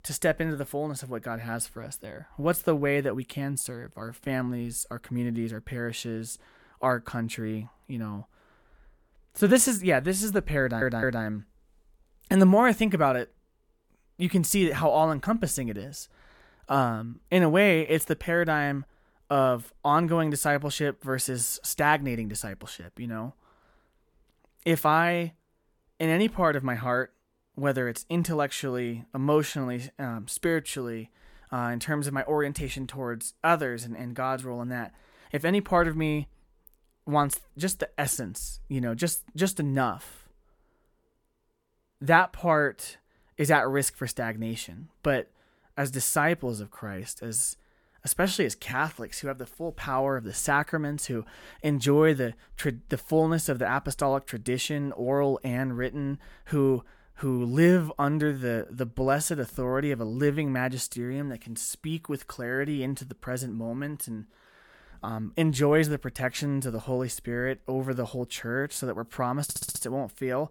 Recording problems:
audio stuttering; at 11 s and at 1:09

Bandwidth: 18 kHz